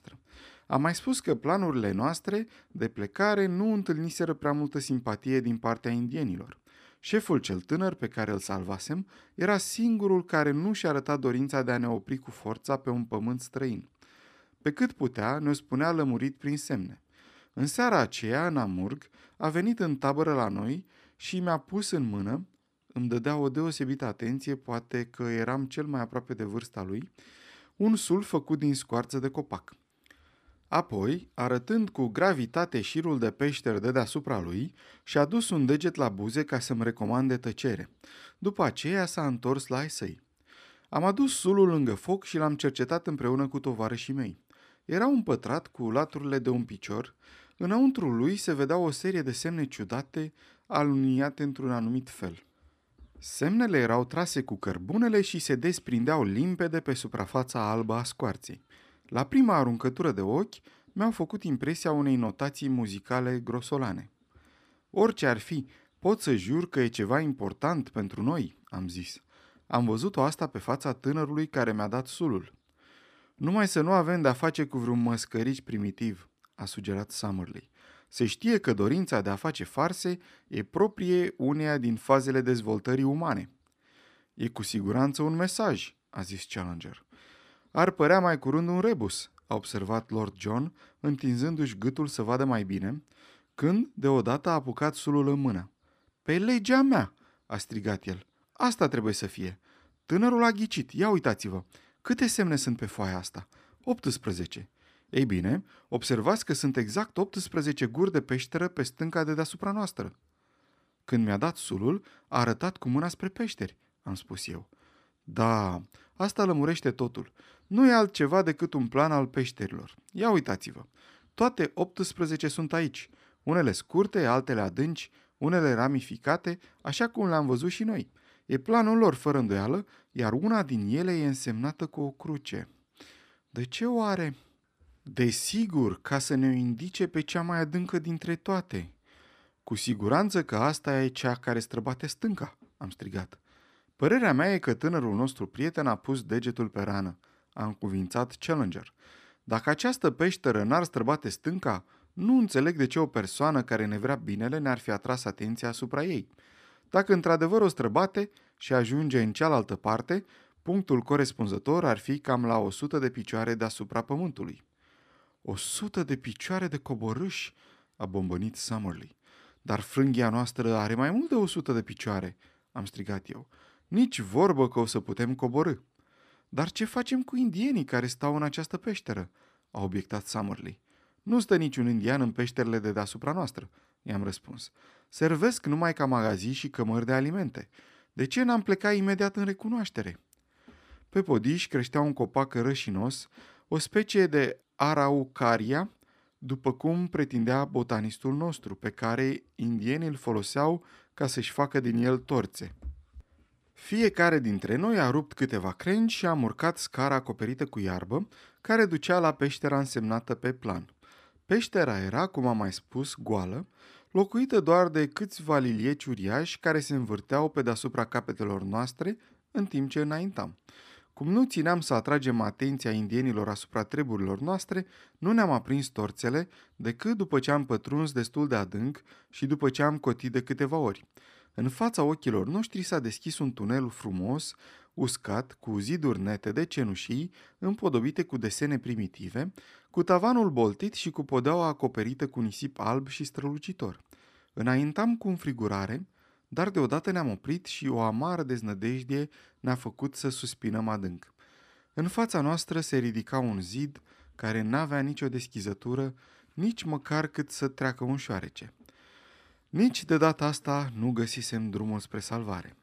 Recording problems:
none

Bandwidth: 14.5 kHz